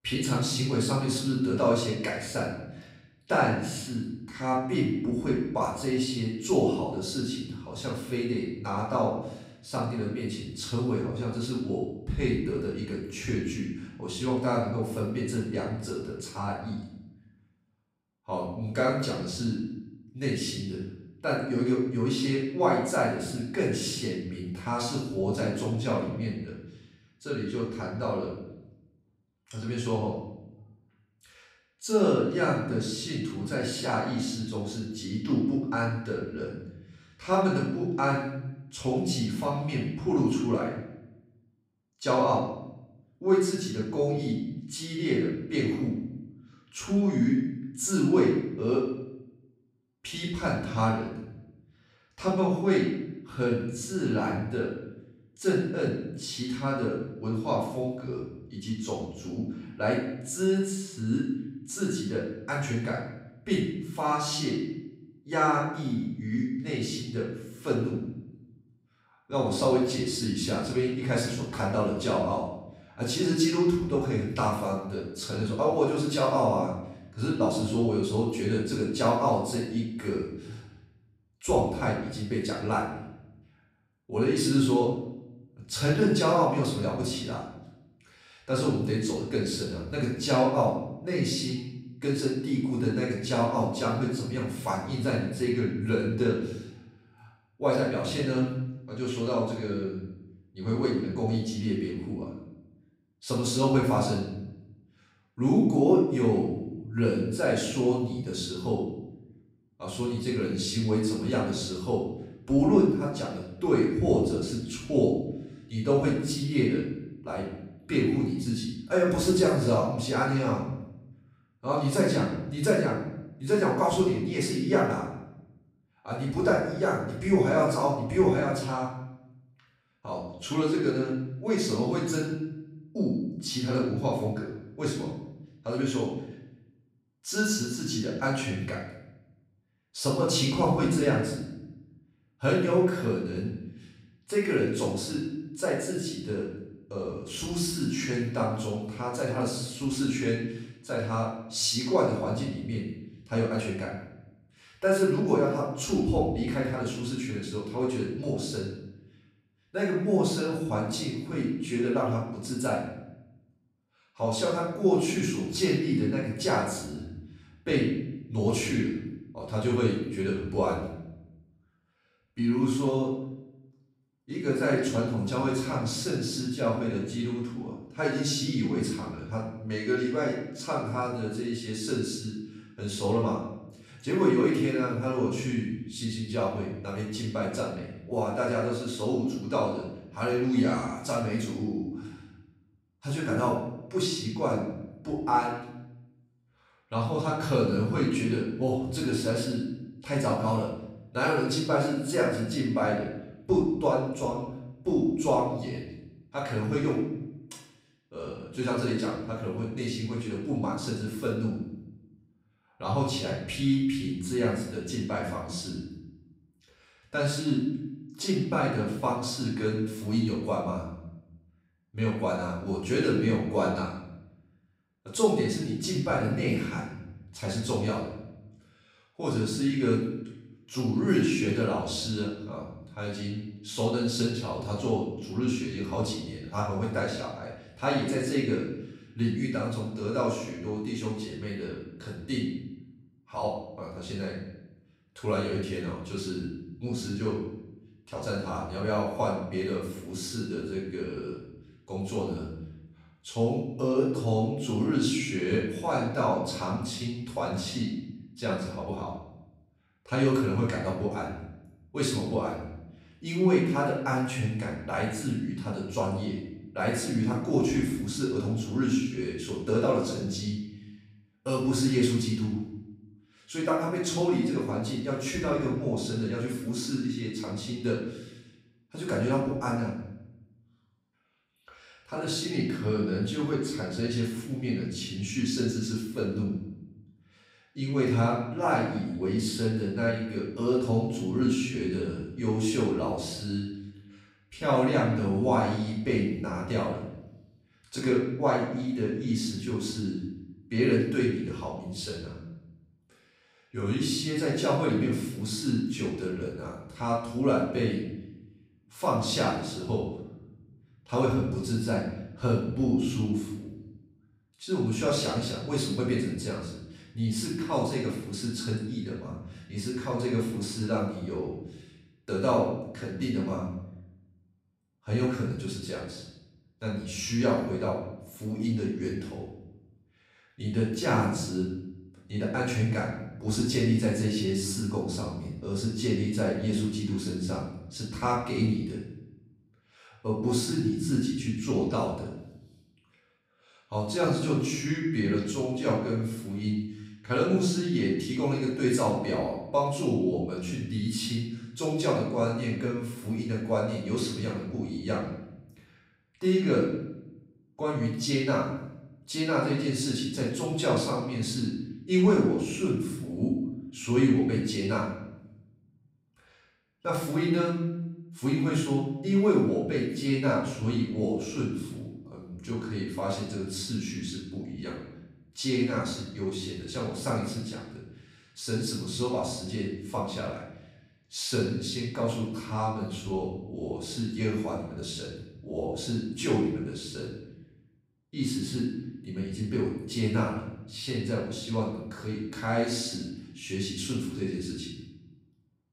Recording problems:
off-mic speech; far
room echo; noticeable; dies away in 0.8 s

